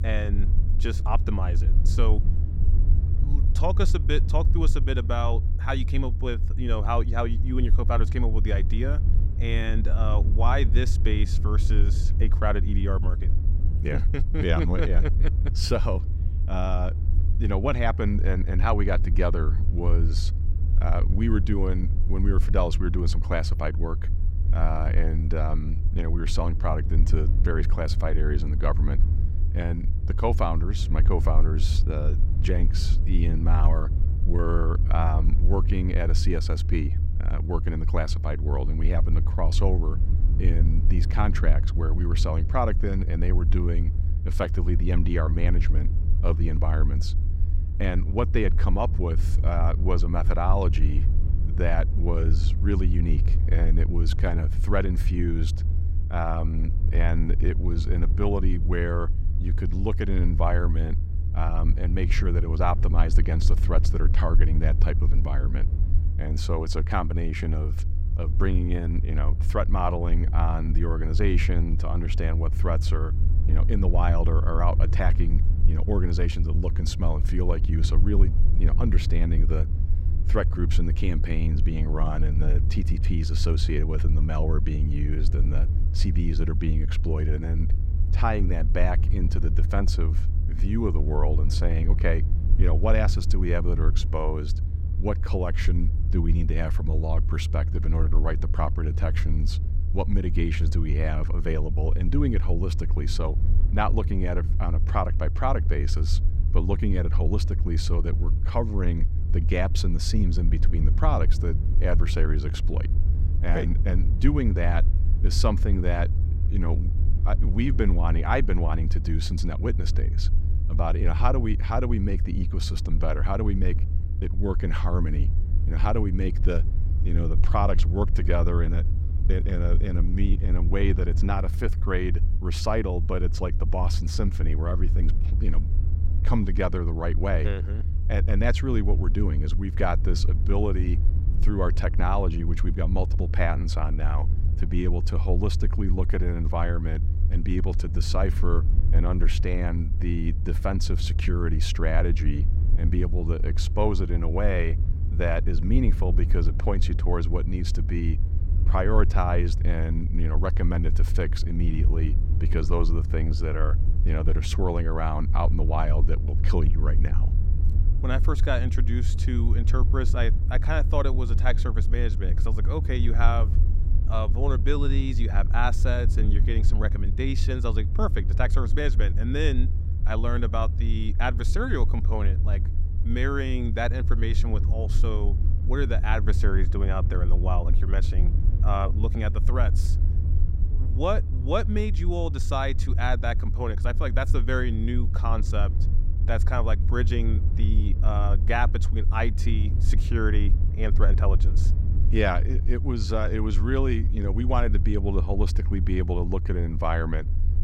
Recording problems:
low rumble; noticeable; throughout; 10 dB below the speech

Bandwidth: 16 kHz